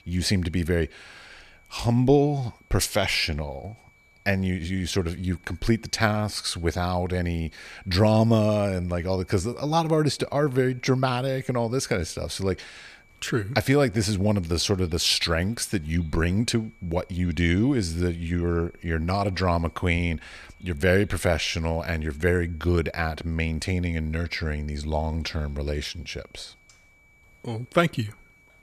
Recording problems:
high-pitched whine; faint; throughout; 2.5 kHz, 30 dB below the speech

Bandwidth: 14.5 kHz